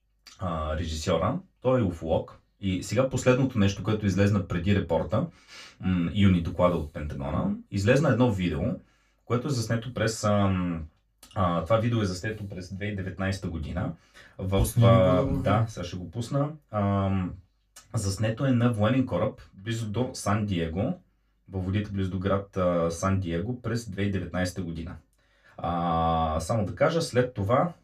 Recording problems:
off-mic speech; far
room echo; very slight; dies away in 0.2 s

